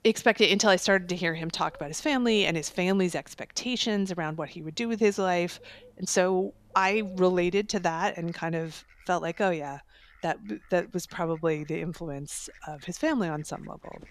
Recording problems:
animal sounds; faint; throughout; 30 dB below the speech

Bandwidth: 14 kHz